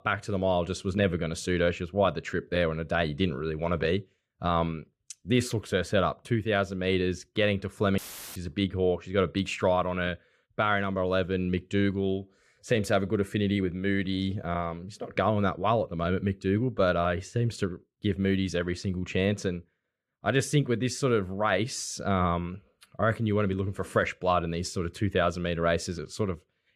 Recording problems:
audio cutting out; filled with static; at 8 s

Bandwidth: 14.5 kHz